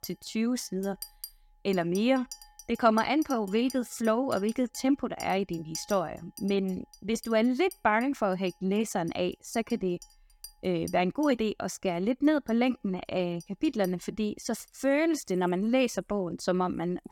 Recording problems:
household noises; noticeable; throughout; 20 dB below the speech

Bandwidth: 17.5 kHz